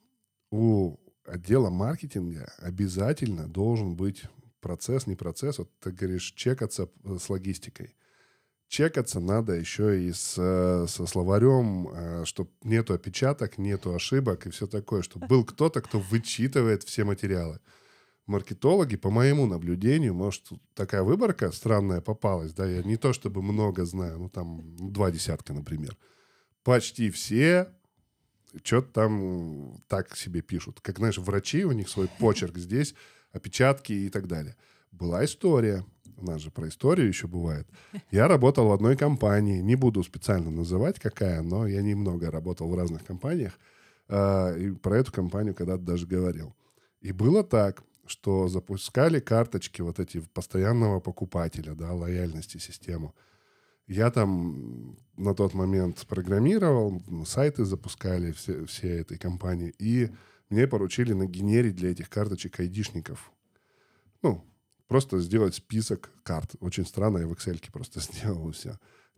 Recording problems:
none

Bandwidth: 17.5 kHz